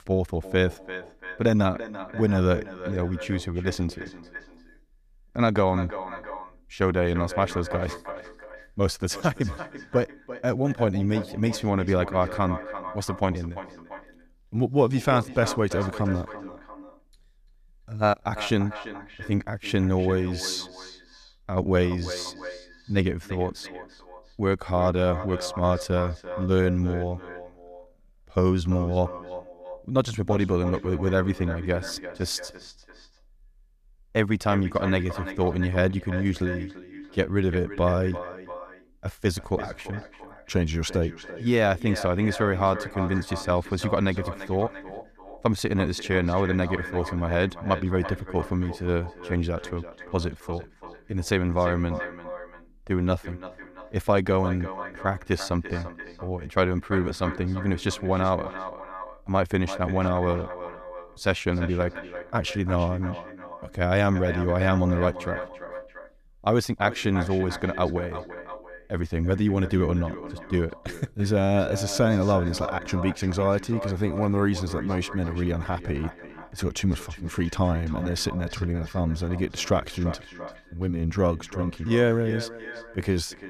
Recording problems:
echo of what is said; noticeable; throughout; 340 ms later, 10 dB below the speech

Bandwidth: 14.5 kHz